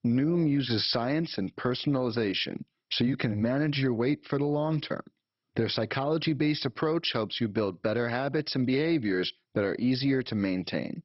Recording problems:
garbled, watery; badly; nothing above 5.5 kHz

